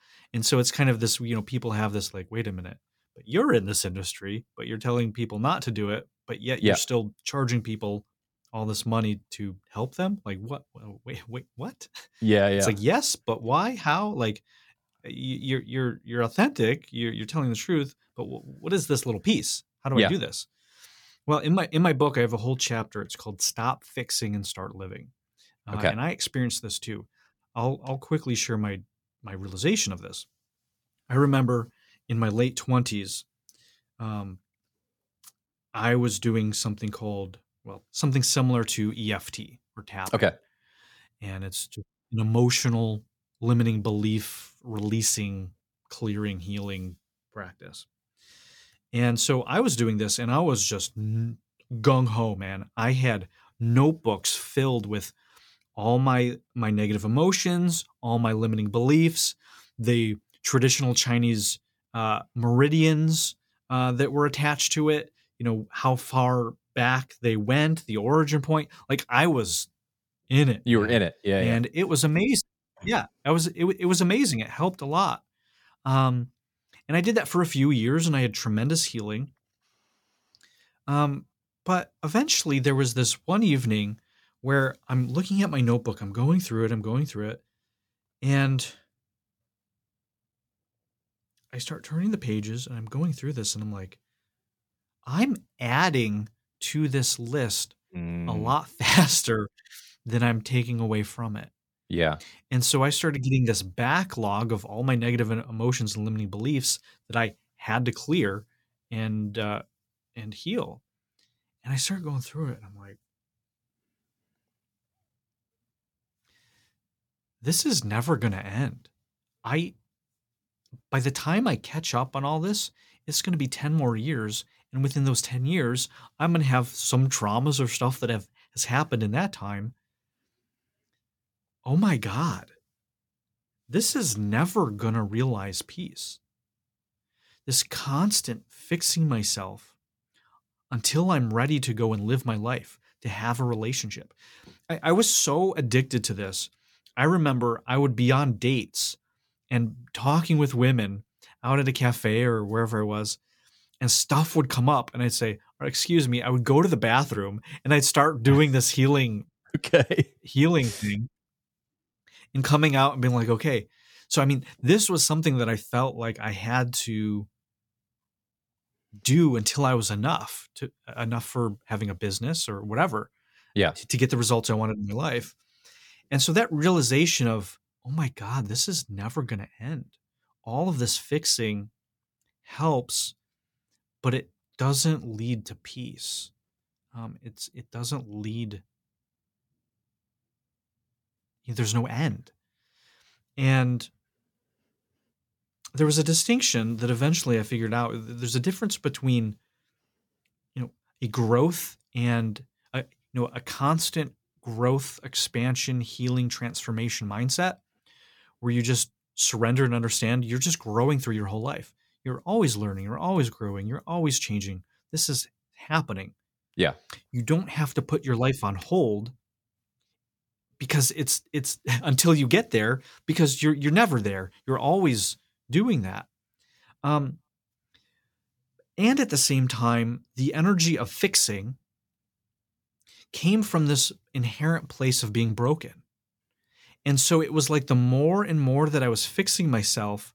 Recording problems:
none

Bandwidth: 18 kHz